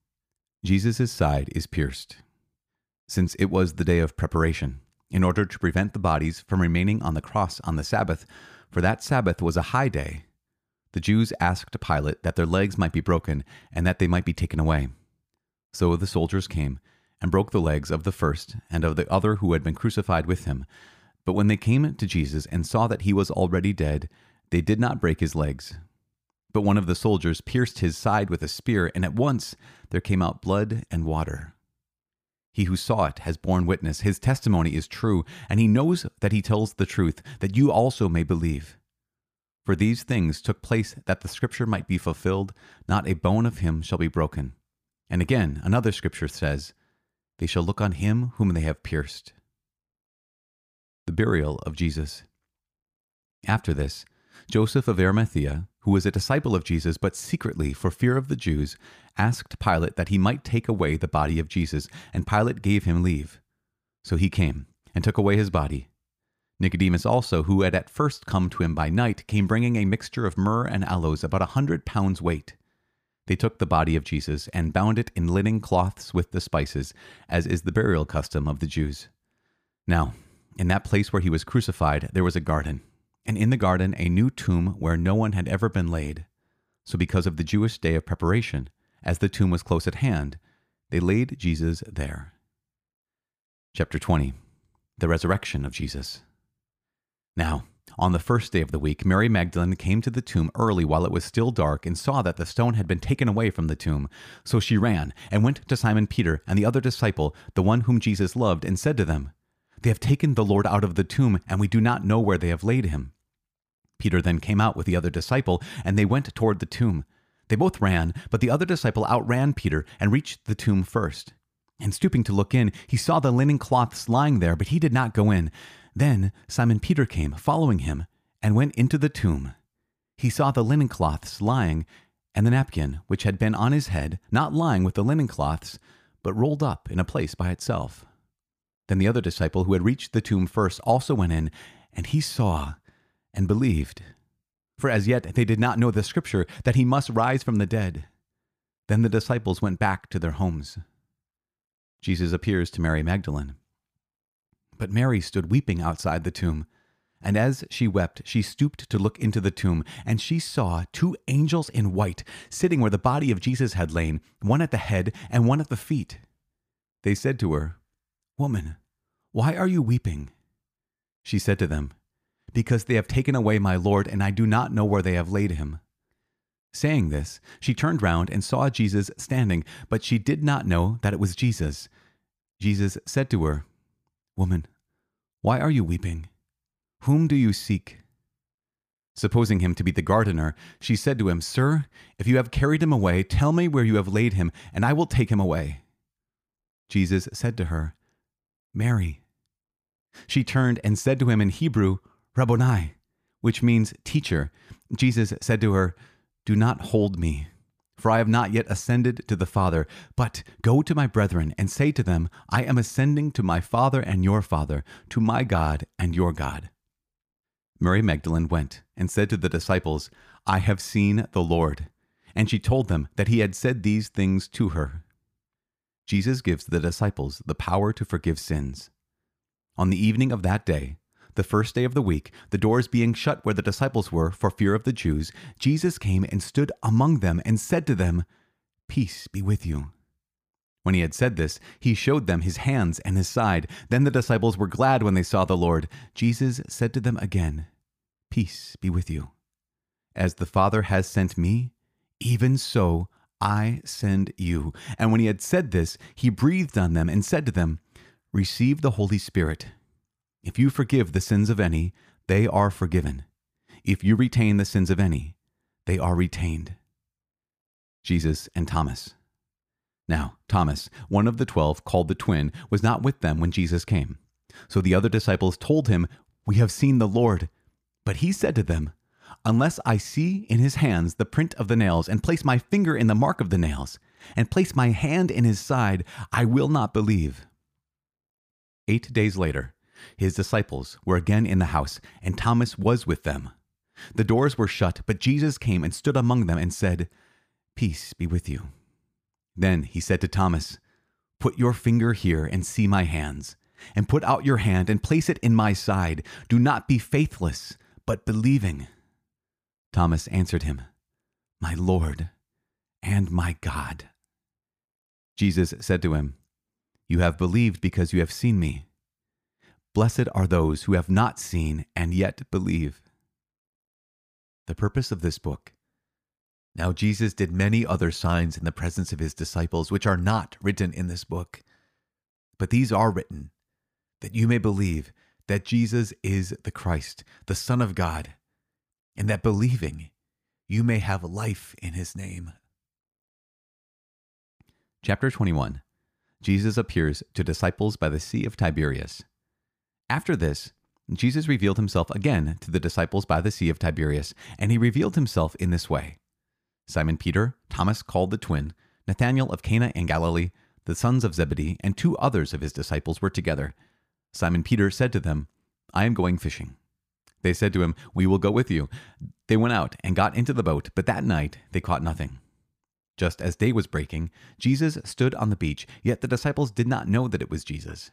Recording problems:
none

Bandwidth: 15 kHz